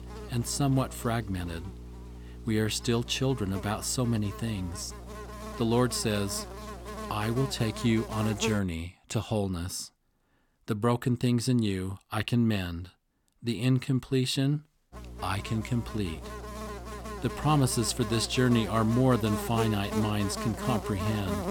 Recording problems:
electrical hum; loud; until 8.5 s and from 15 s on; 60 Hz, 7 dB below the speech

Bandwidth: 17.5 kHz